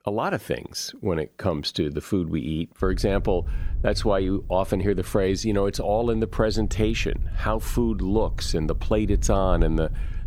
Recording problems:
wind noise on the microphone; occasional gusts; from 3 s on; 25 dB below the speech

